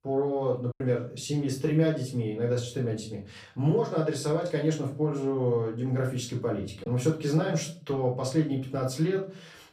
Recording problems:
off-mic speech; far
room echo; slight; dies away in 0.4 s
choppy; occasionally; at 0.5 s; 2% of the speech affected

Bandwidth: 15 kHz